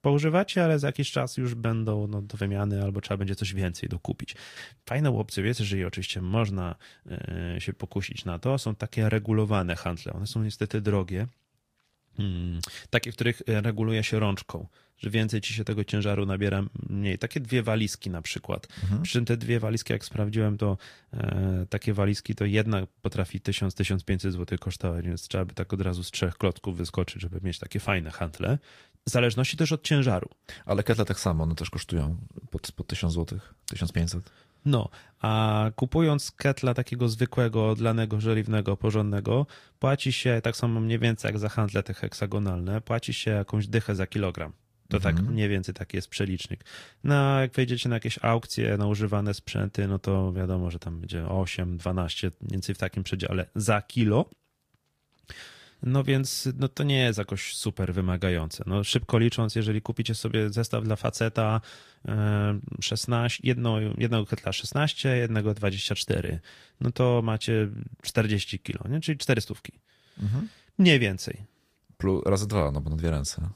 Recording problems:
garbled, watery; slightly; nothing above 15 kHz

